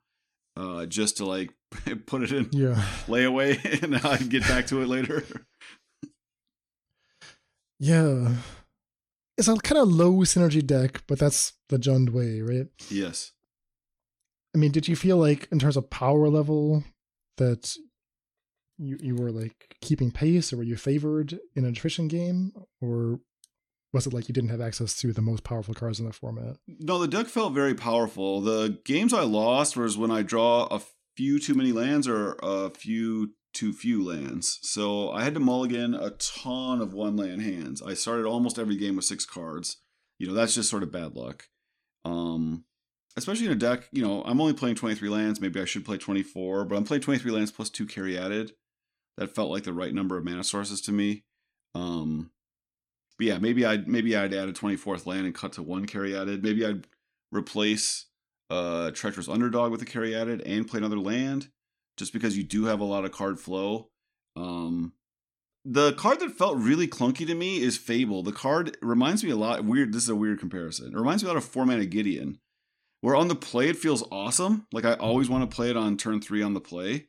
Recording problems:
none

